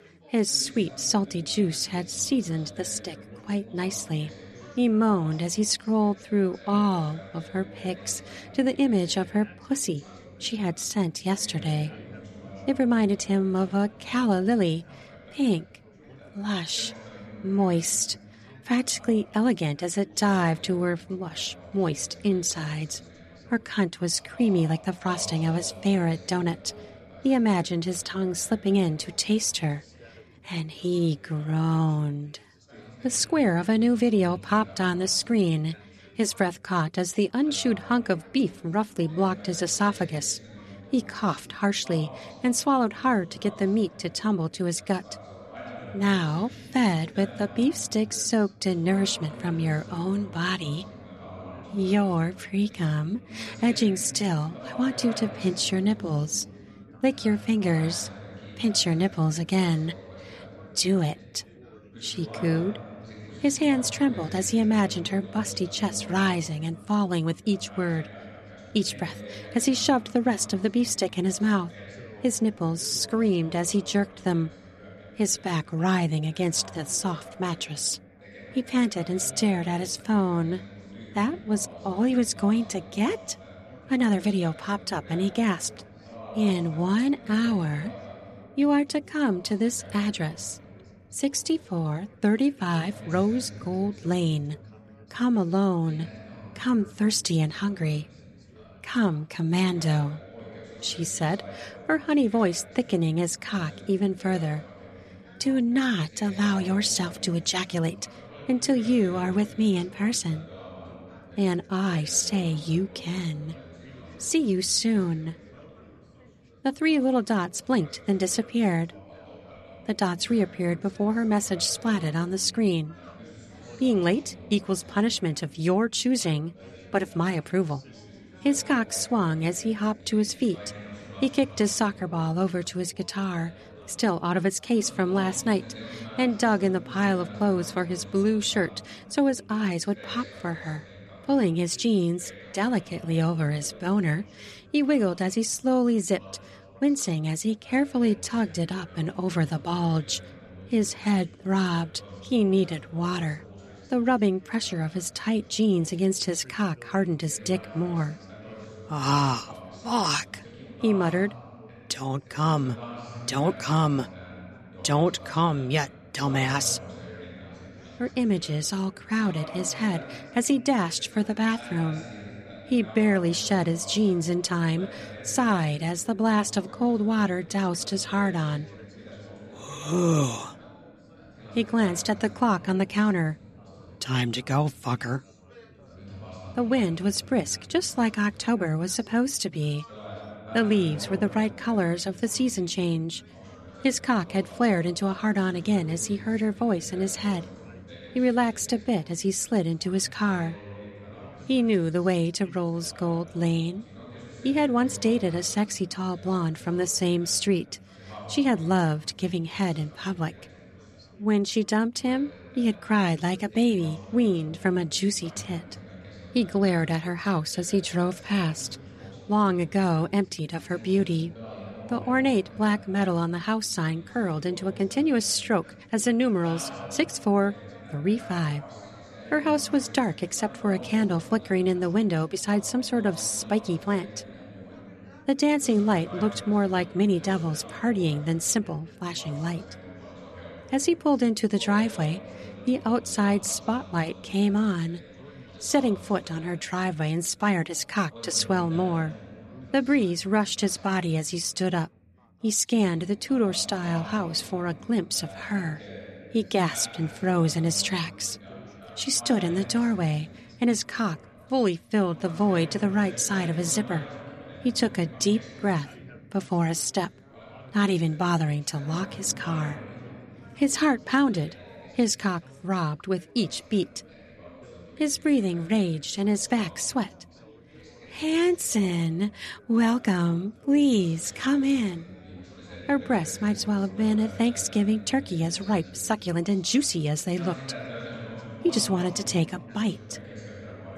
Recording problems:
background chatter; noticeable; throughout; 4 voices, 20 dB below the speech

